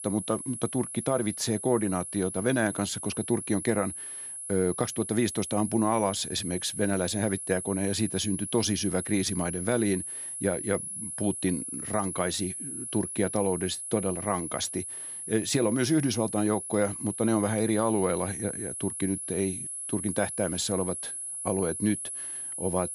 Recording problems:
high-pitched whine; loud; throughout; 10.5 kHz, 6 dB below the speech

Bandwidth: 15.5 kHz